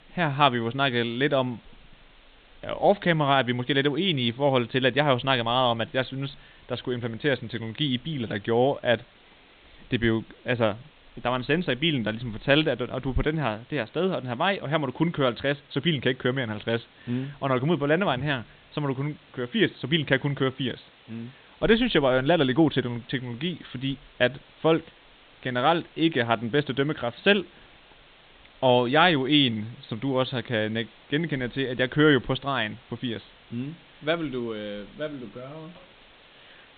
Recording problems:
high frequencies cut off; severe; nothing above 4 kHz
hiss; faint; throughout; 30 dB below the speech

